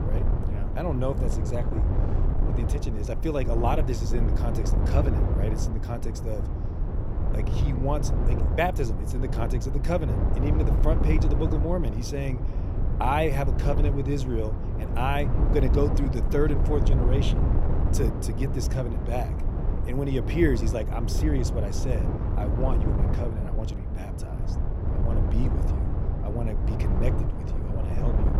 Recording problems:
wind noise on the microphone; heavy; 5 dB below the speech

